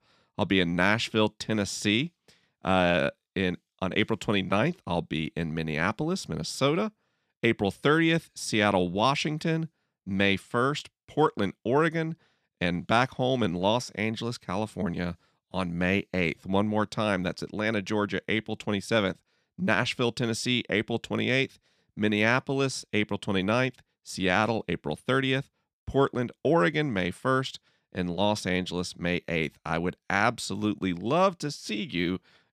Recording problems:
none

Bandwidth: 14.5 kHz